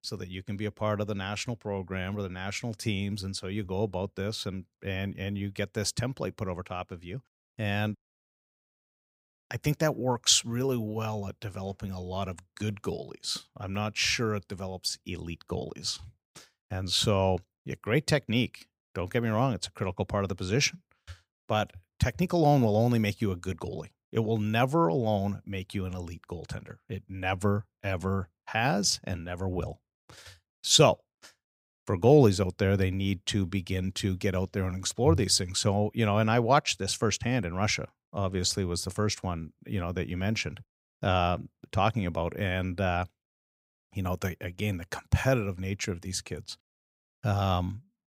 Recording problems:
none

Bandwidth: 15.5 kHz